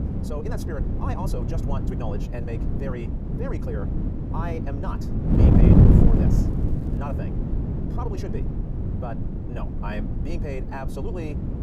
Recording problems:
wrong speed, natural pitch; too fast; 1.8 times normal speed
wind noise on the microphone; heavy; 3 dB above the speech
low rumble; noticeable; until 3 s and from 5 s on; 20 dB below the speech
crackling; faint; from 5.5 to 7 s; 30 dB below the speech
electrical hum; very faint; throughout; 60 Hz, 25 dB below the speech

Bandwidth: 15.5 kHz